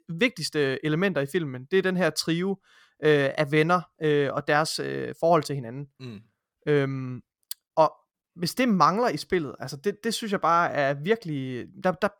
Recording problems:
none

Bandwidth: 18 kHz